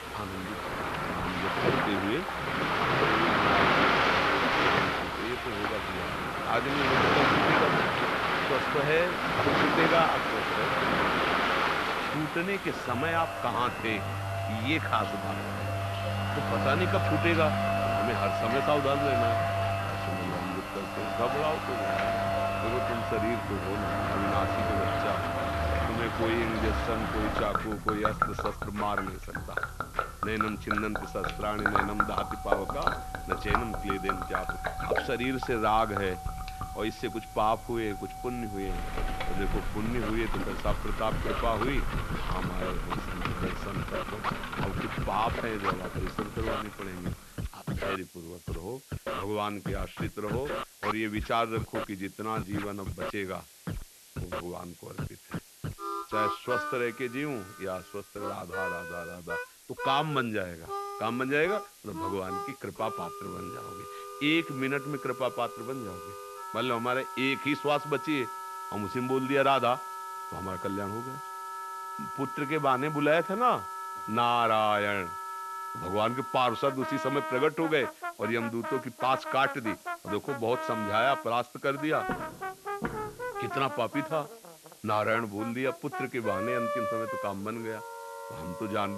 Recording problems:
muffled; slightly; fading above 3 kHz
rain or running water; very loud; until 47 s; 2 dB above the speech
background music; loud; from 22 s on; 7 dB below the speech
hiss; noticeable; throughout; 20 dB below the speech
footsteps; noticeable; from 1:22 to 1:23; peak 5 dB below the speech
abrupt cut into speech; at the end

